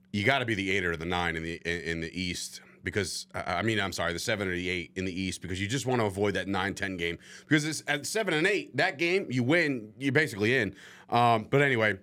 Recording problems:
none

